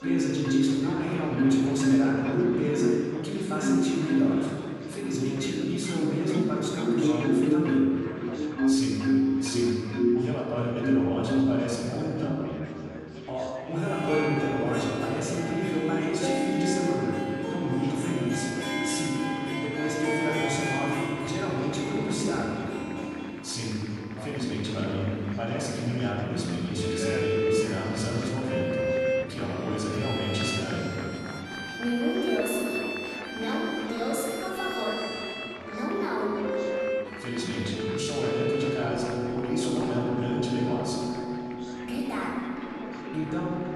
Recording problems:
room echo; strong; dies away in 2.4 s
off-mic speech; far
background music; very loud; throughout; as loud as the speech
chatter from many people; noticeable; throughout; 10 dB below the speech

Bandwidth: 13 kHz